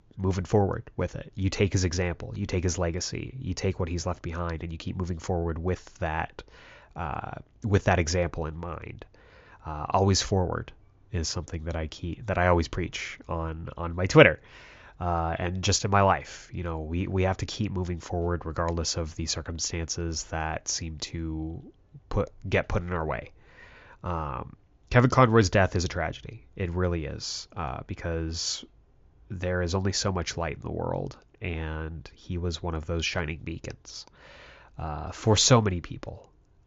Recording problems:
high frequencies cut off; noticeable; nothing above 7 kHz

